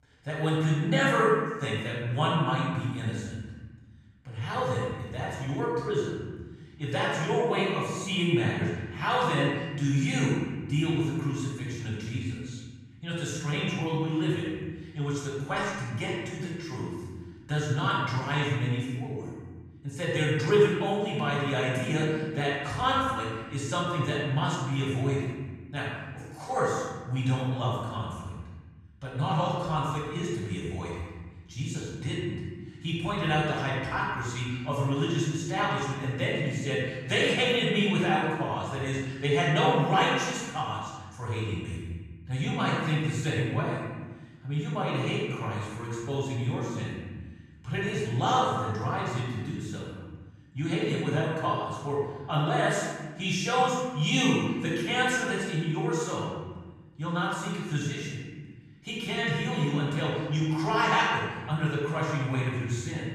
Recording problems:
room echo; strong; dies away in 1.4 s
off-mic speech; far

